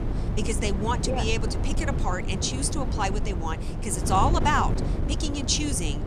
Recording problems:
wind noise on the microphone; heavy; 9 dB below the speech

